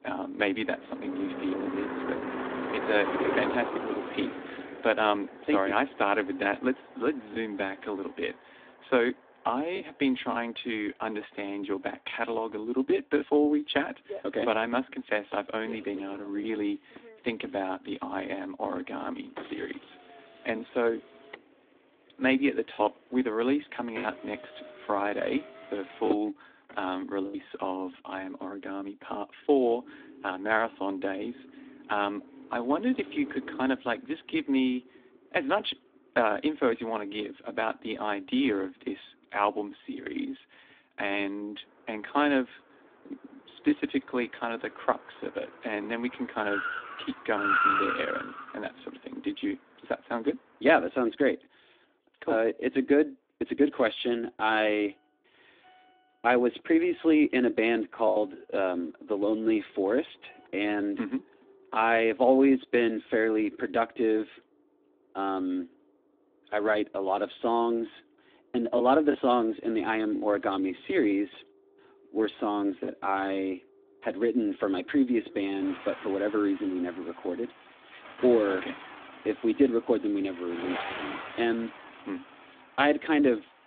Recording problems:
phone-call audio
traffic noise; loud; throughout; 8 dB below the speech
choppy; occasionally; 1% of the speech affected

